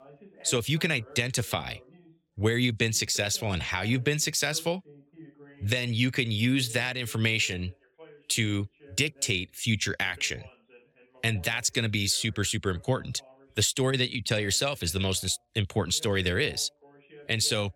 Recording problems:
voice in the background; faint; throughout; 25 dB below the speech

